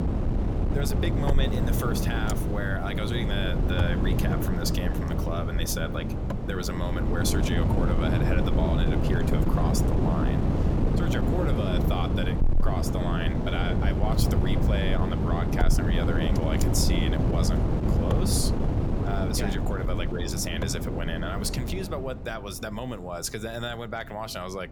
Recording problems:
wind noise on the microphone; heavy; 1 dB below the speech

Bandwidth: 18 kHz